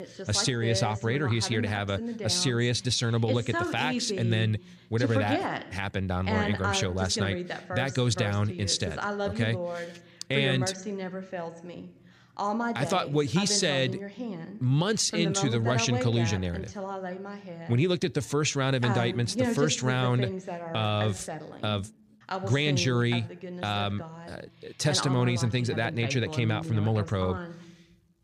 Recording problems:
voice in the background; loud; throughout; 7 dB below the speech

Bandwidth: 15 kHz